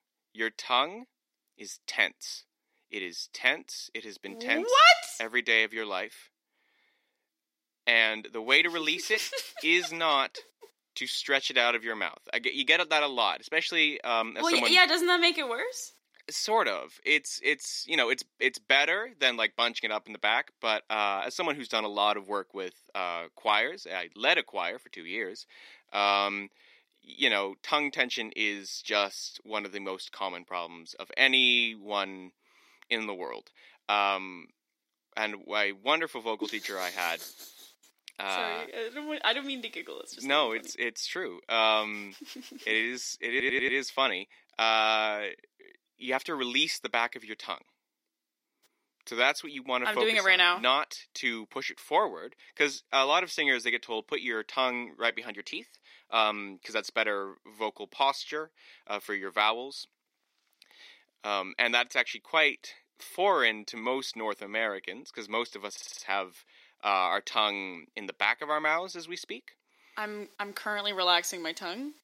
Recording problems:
thin; somewhat; fading below 350 Hz
audio stuttering; at 43 s and at 1:06

